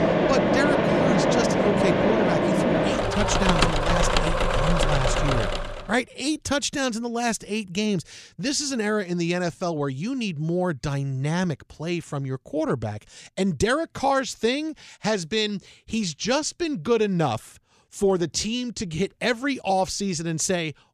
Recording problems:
machinery noise; very loud; until 5.5 s; 4 dB above the speech

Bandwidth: 14.5 kHz